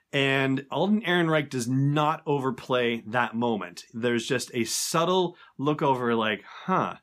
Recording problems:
none

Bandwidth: 15 kHz